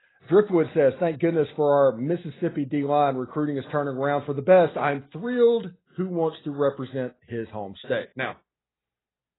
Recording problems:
garbled, watery; badly; nothing above 4 kHz

